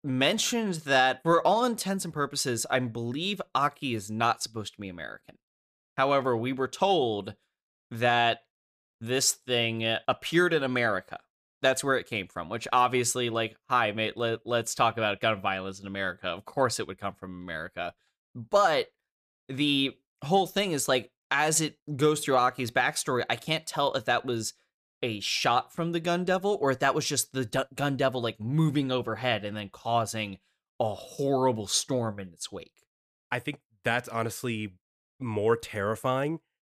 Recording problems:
none

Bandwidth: 14.5 kHz